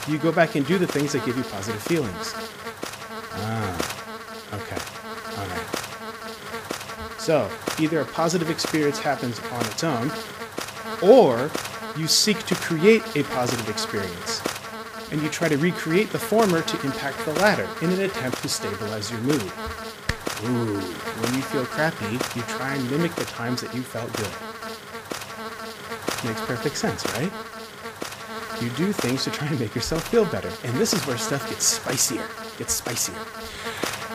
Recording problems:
electrical hum; loud; throughout; 60 Hz, 6 dB below the speech

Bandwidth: 15 kHz